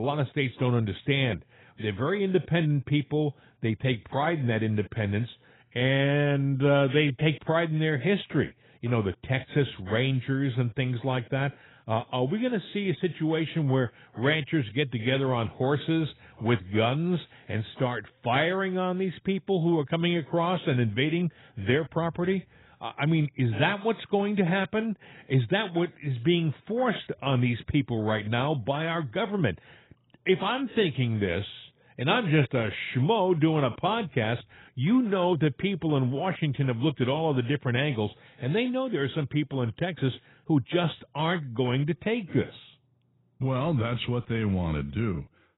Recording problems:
garbled, watery; badly; nothing above 3.5 kHz
abrupt cut into speech; at the start

